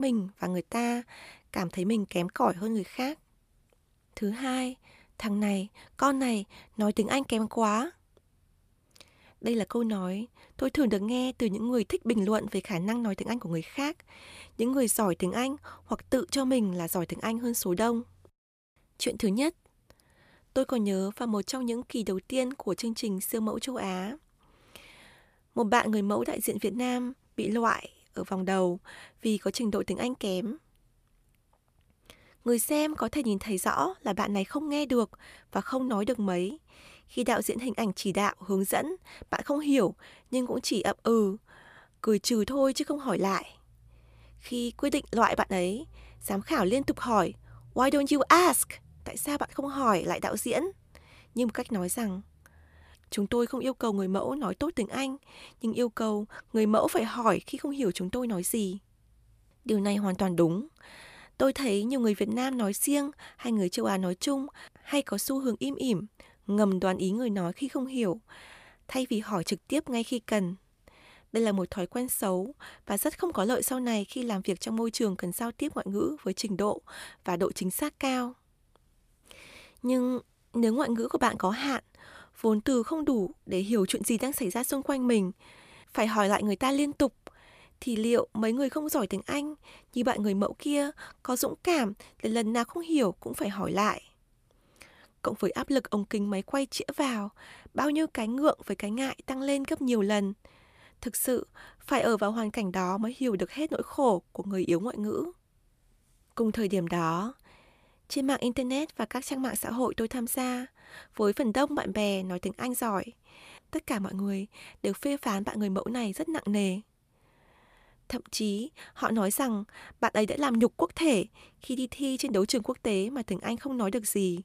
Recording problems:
abrupt cut into speech; at the start

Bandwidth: 14.5 kHz